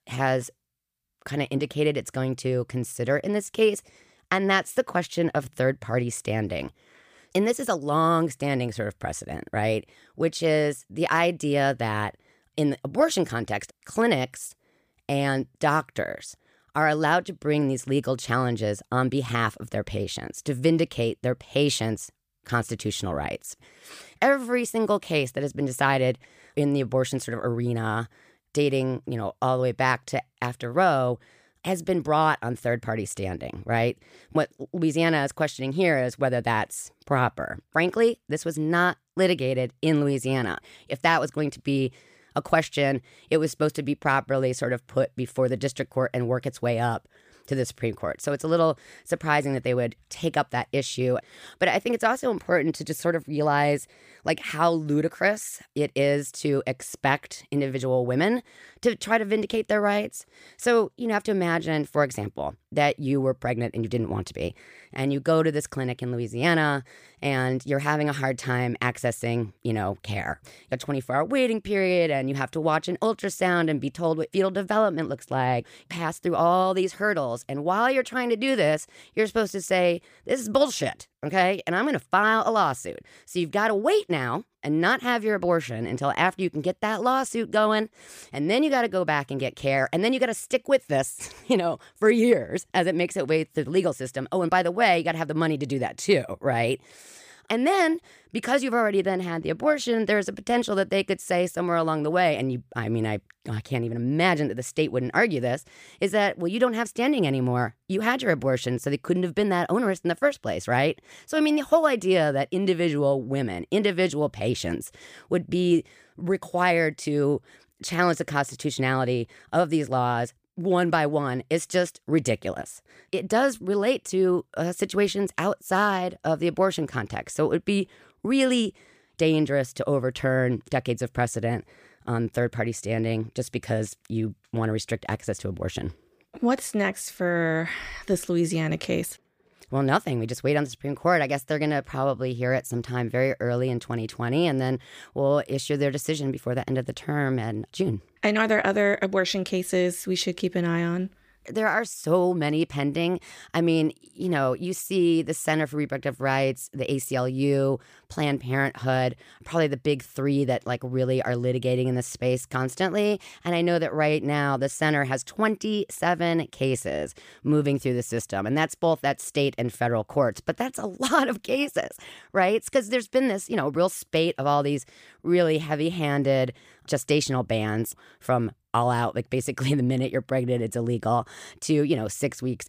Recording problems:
none

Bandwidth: 15 kHz